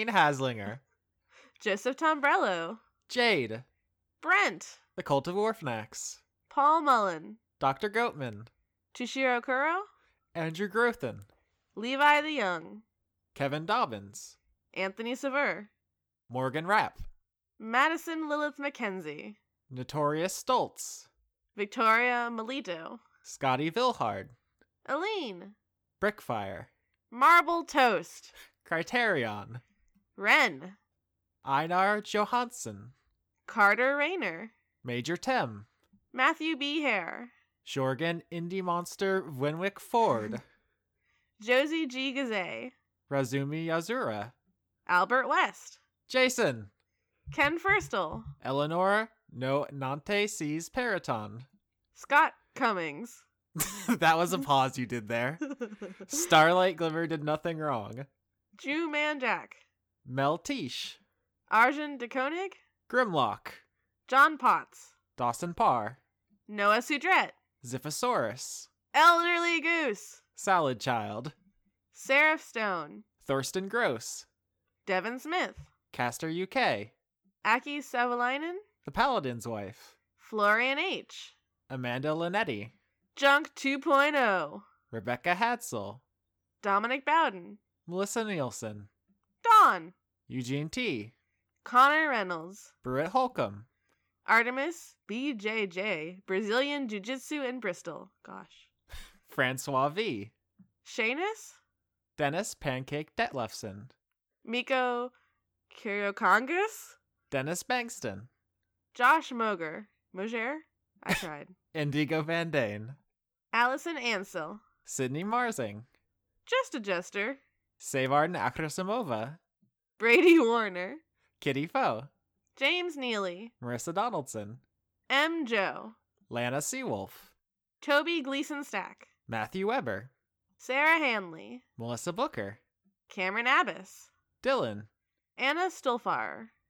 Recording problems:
abrupt cut into speech; at the start

